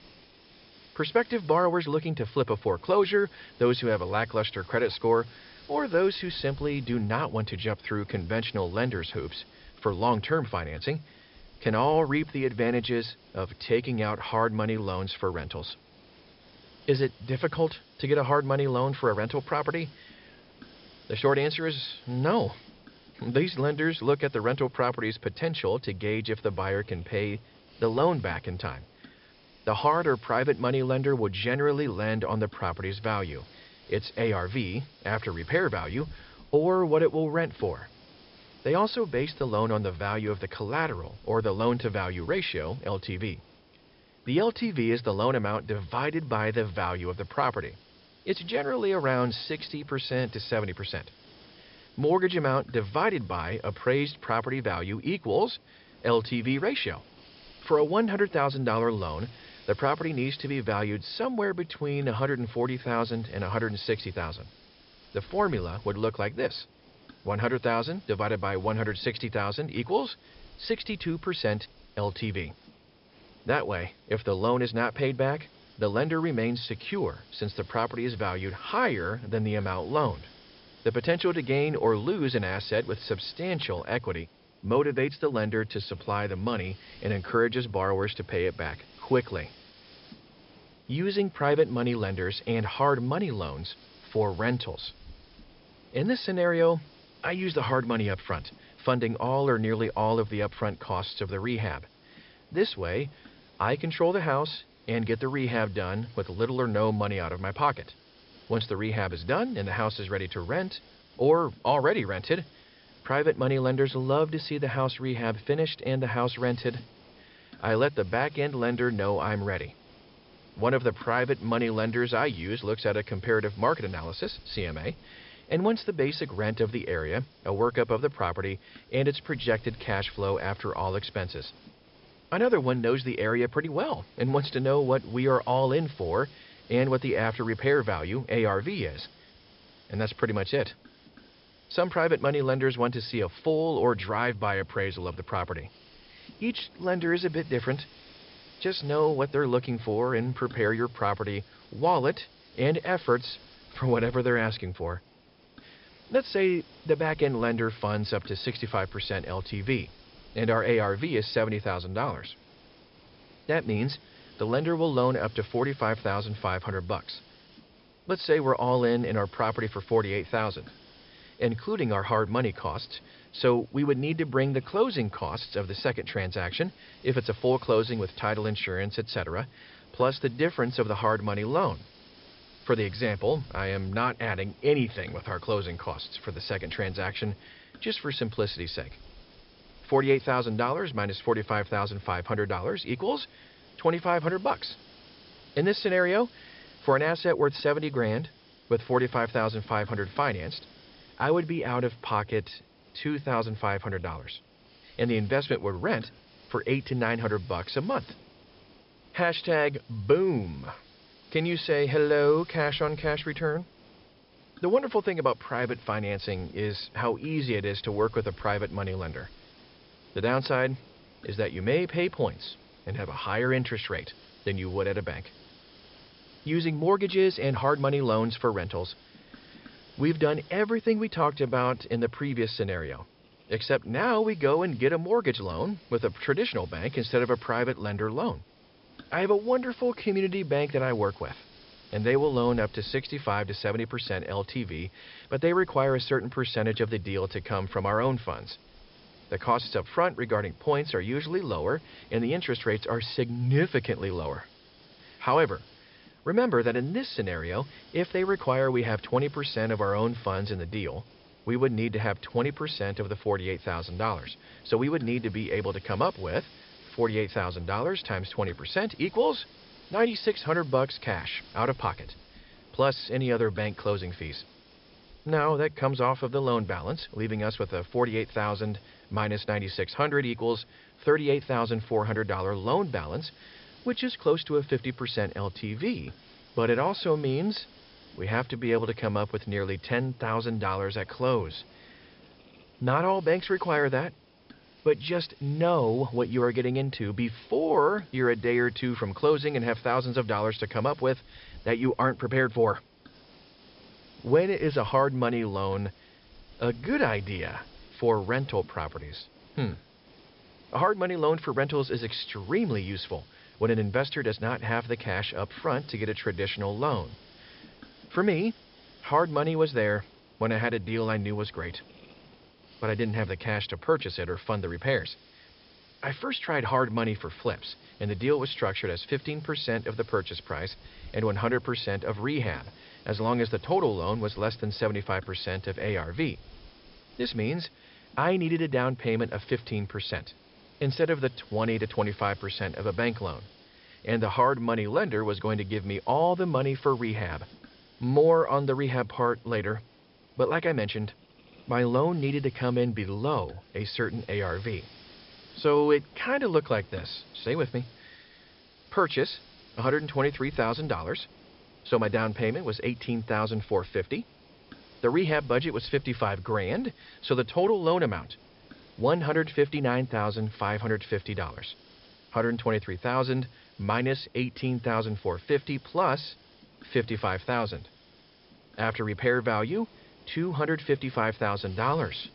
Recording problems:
high frequencies cut off; noticeable; nothing above 5.5 kHz
hiss; faint; throughout; 25 dB below the speech

